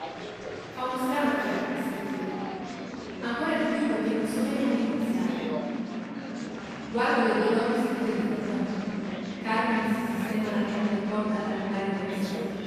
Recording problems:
room echo; strong; dies away in 3 s
off-mic speech; far
murmuring crowd; noticeable; throughout; 10 dB below the speech

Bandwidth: 14.5 kHz